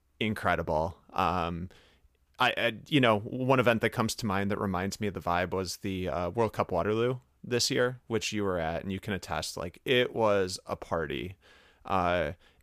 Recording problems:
none

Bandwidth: 15 kHz